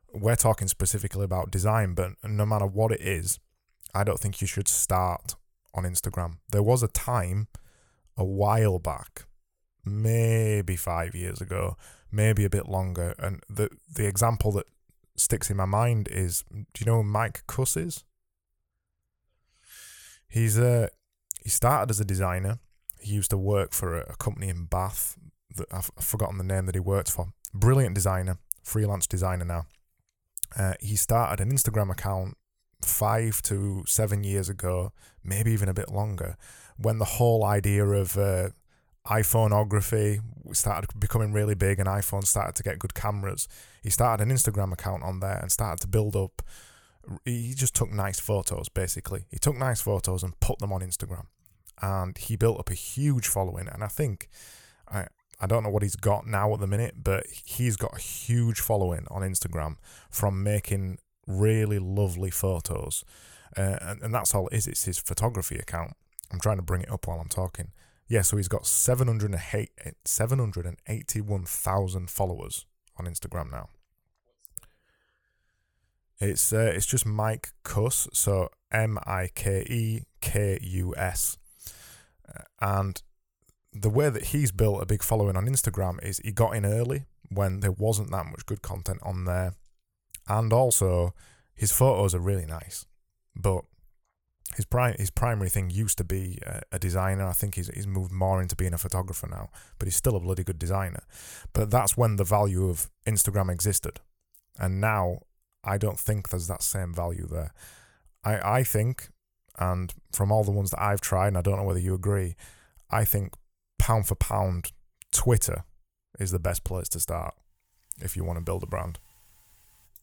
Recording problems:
none

